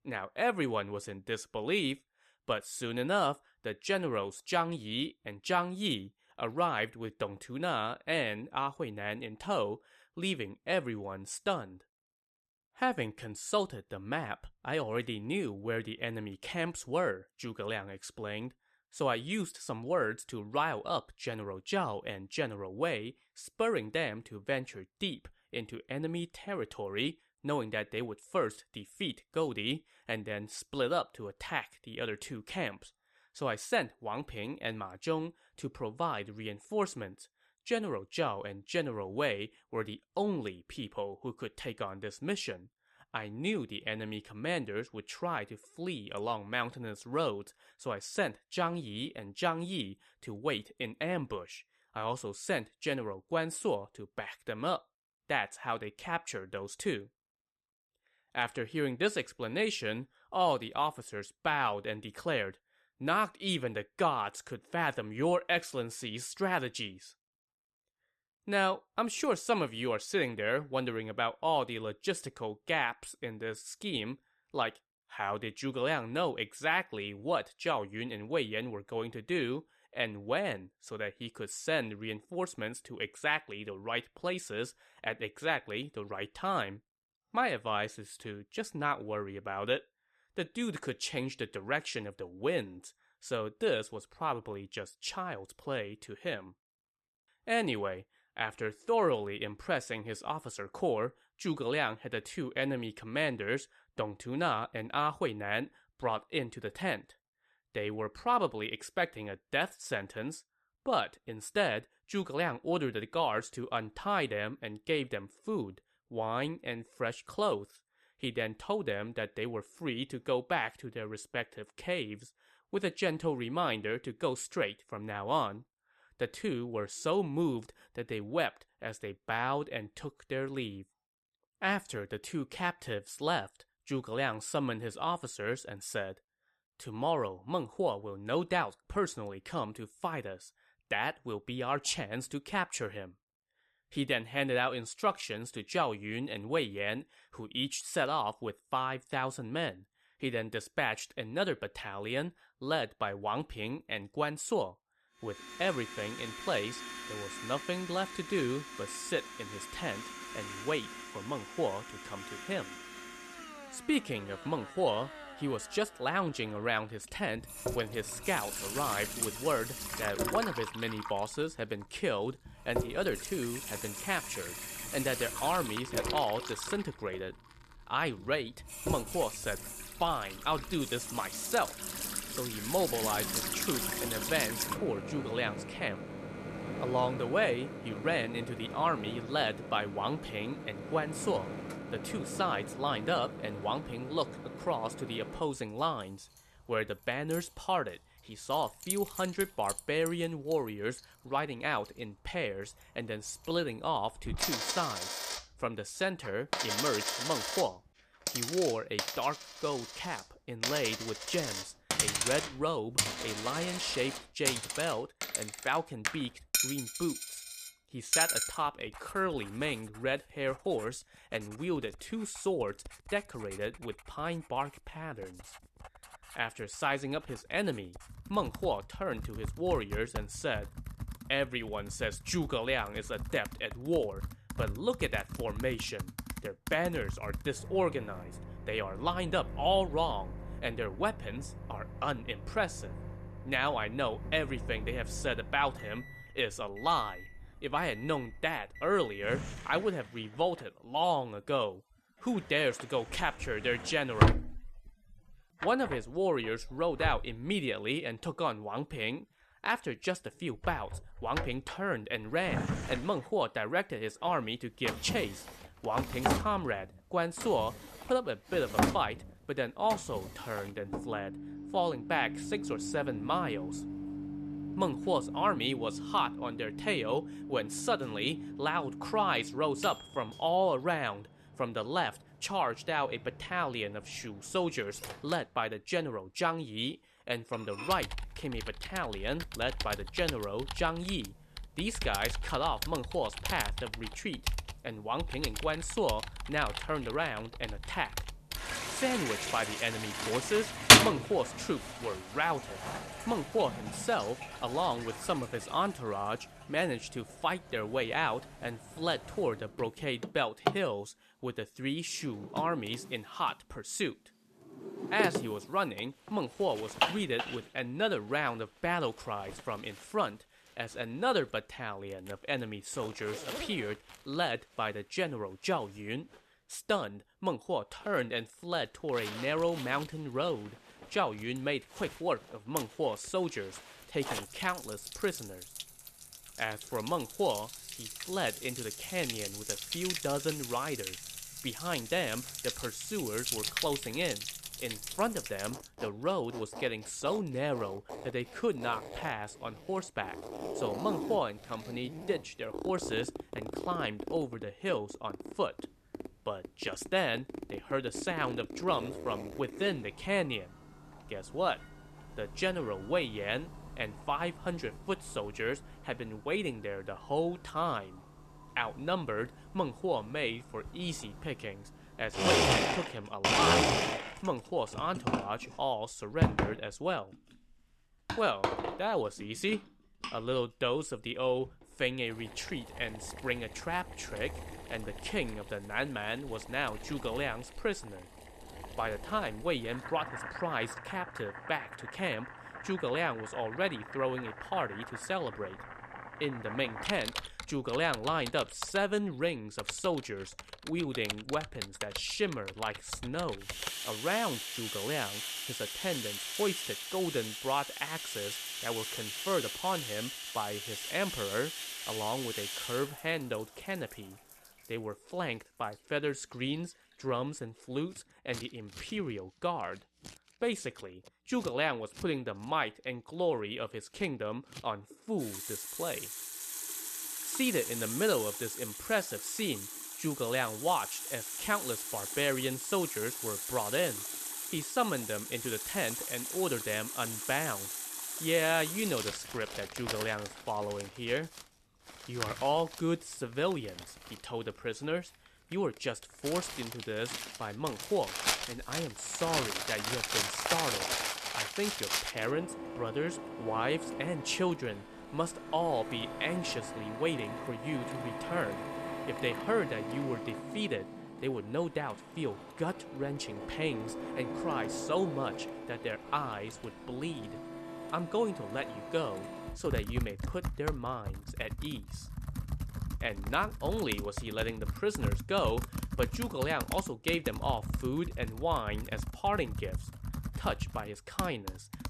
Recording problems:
household noises; loud; from 2:35 on; 2 dB below the speech

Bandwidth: 14 kHz